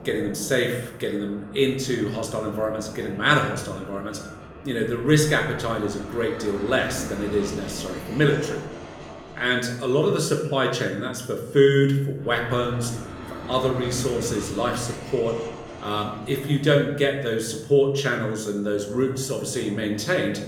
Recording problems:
room echo; slight; dies away in 0.7 s
off-mic speech; somewhat distant
train or aircraft noise; noticeable; throughout; 15 dB below the speech

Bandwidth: 18.5 kHz